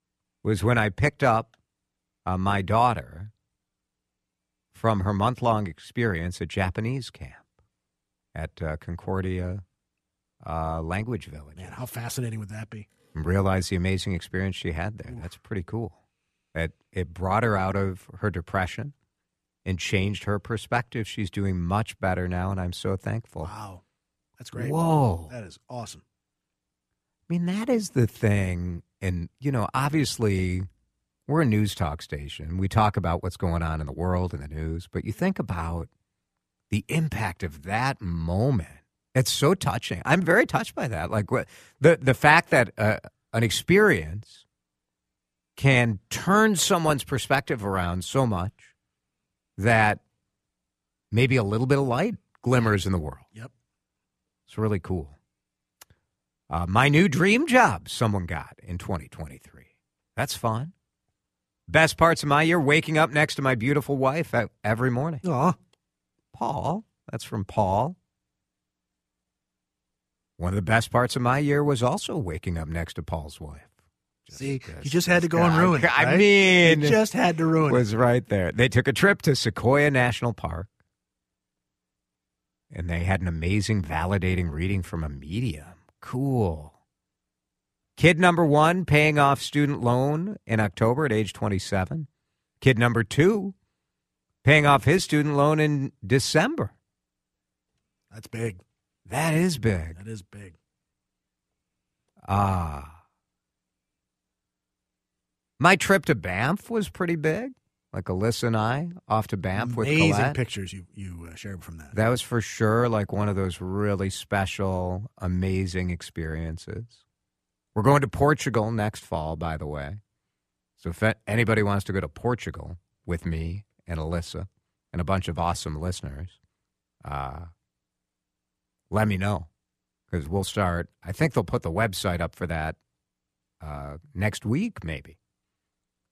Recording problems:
none

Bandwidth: 14.5 kHz